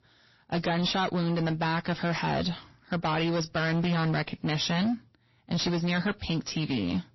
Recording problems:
distortion; heavy; 20% of the sound clipped
garbled, watery; slightly; nothing above 5.5 kHz

